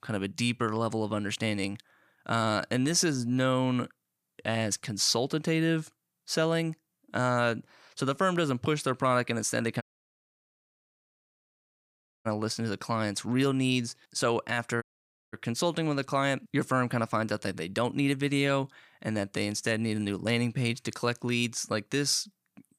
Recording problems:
audio cutting out; at 10 s for 2.5 s and at 15 s for 0.5 s

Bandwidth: 15 kHz